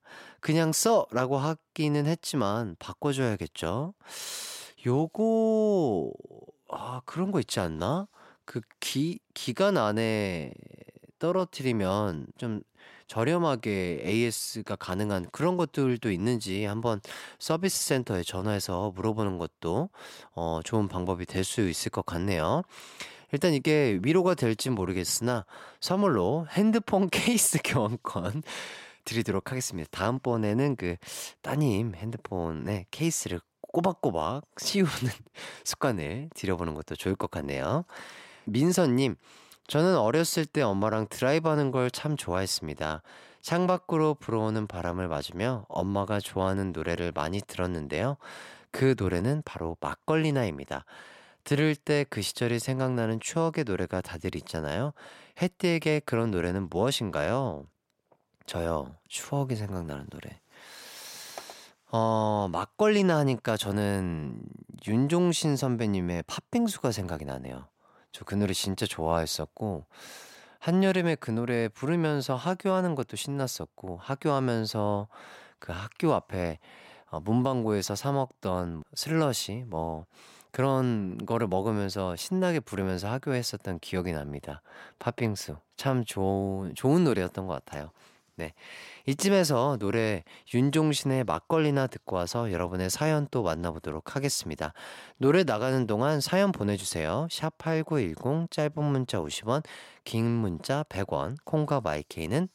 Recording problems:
none

